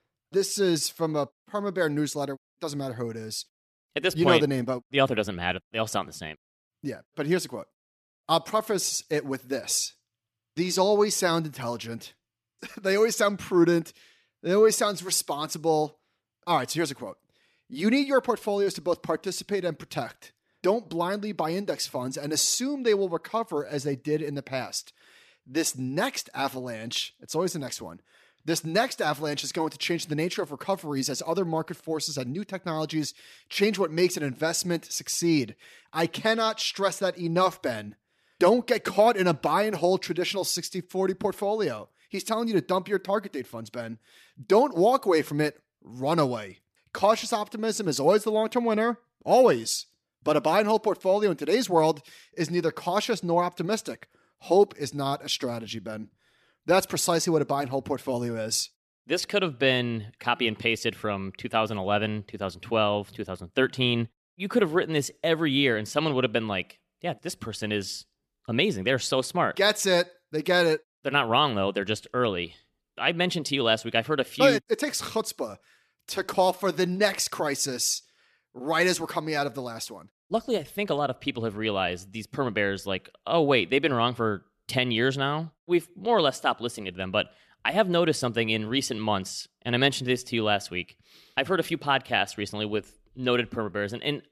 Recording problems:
none

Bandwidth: 14.5 kHz